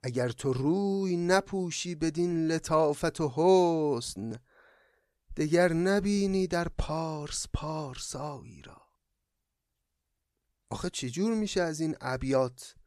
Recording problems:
none

